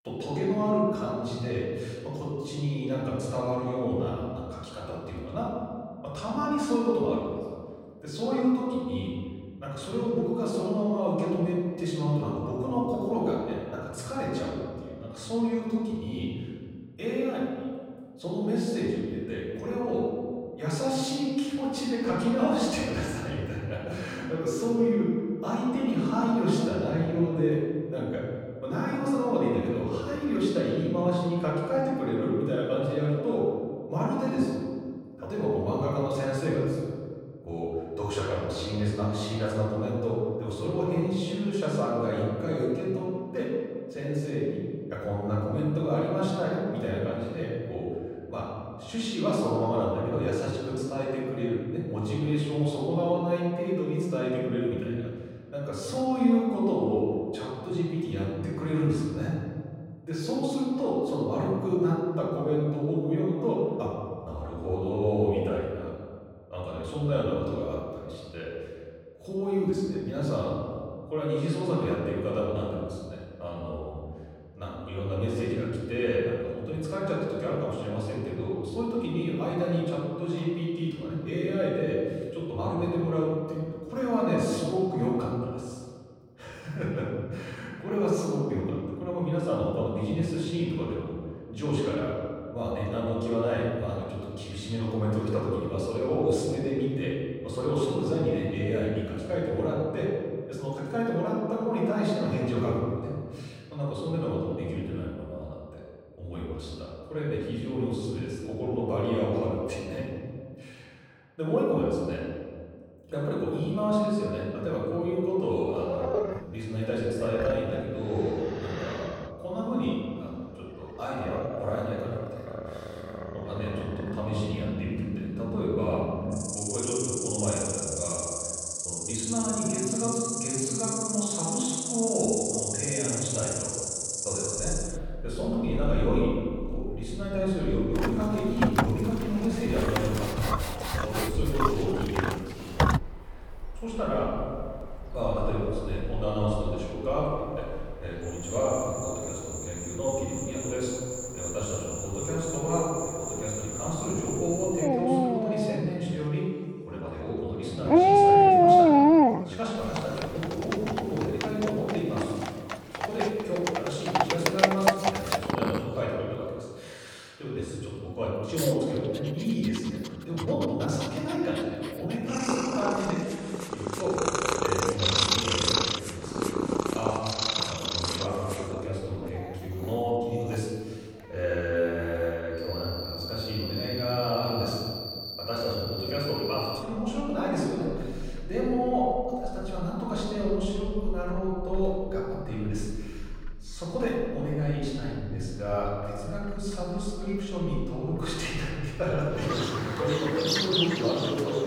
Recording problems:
off-mic speech; far
room echo; noticeable; dies away in 1.8 s
animal sounds; very loud; from 1:56 on; 1 dB above the speech

